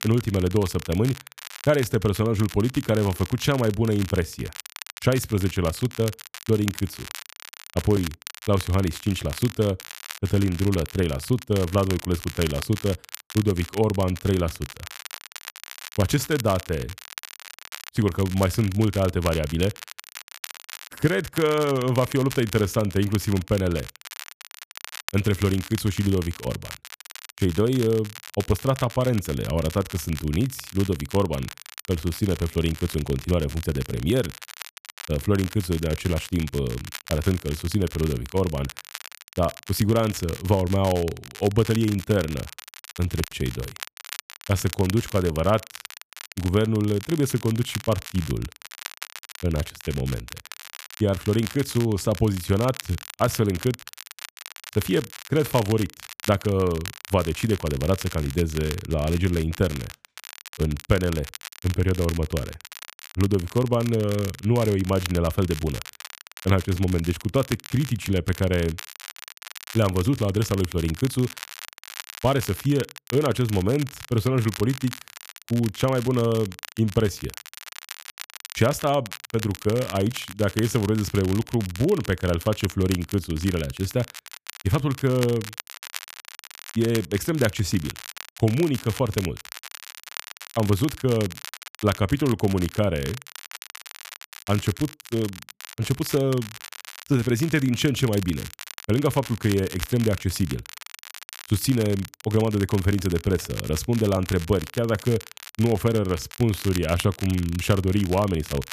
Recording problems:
crackle, like an old record; noticeable; 15 dB below the speech

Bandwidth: 14.5 kHz